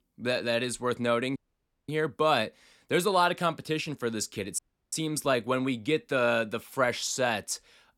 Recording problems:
audio cutting out; at 1.5 s for 0.5 s and at 4.5 s

